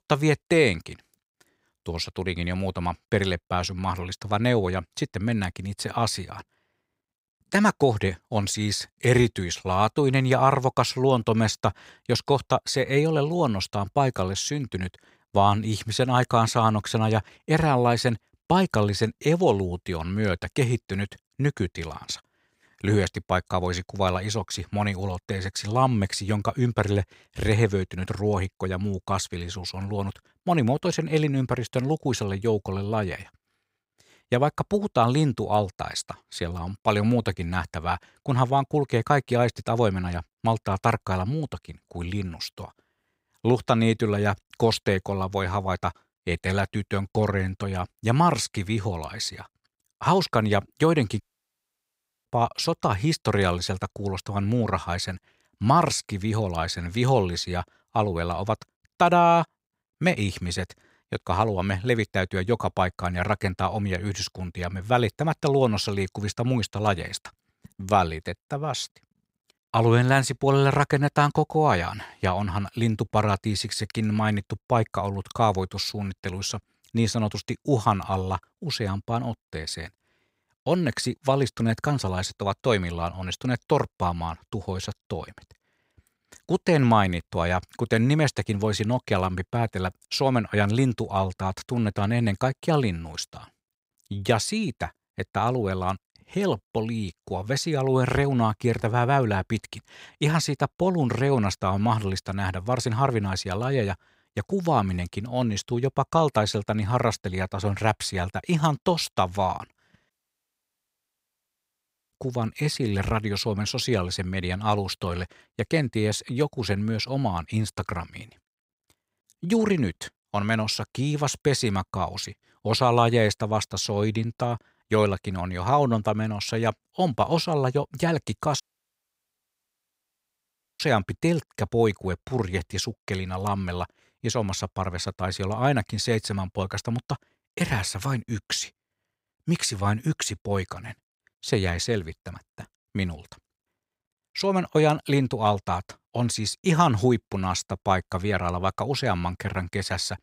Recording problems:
audio cutting out; at 51 s for 1 s, at 1:50 for 2 s and at 2:09 for 2 s

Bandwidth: 15.5 kHz